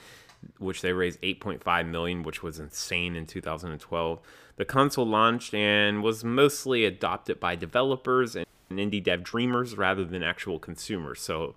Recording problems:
audio freezing; at 8.5 s

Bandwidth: 15 kHz